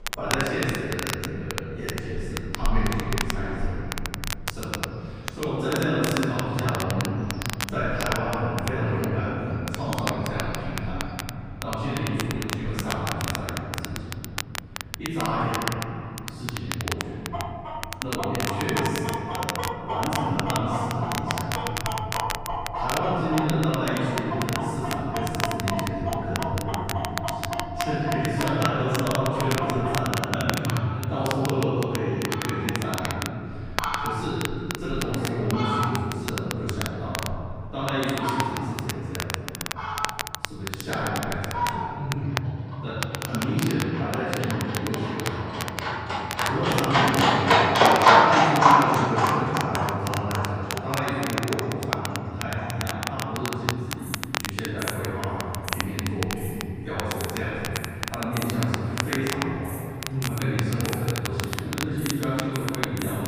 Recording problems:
room echo; strong; dies away in 3 s
off-mic speech; far
animal sounds; very loud; throughout; 2 dB above the speech
crackle, like an old record; loud; 5 dB below the speech

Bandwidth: 15 kHz